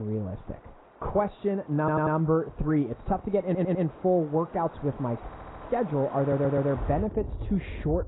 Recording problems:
garbled, watery; badly; nothing above 4 kHz
muffled; very slightly; fading above 1.5 kHz
rain or running water; noticeable; throughout; 15 dB below the speech
abrupt cut into speech; at the start
audio stuttering; 4 times, first at 2 s

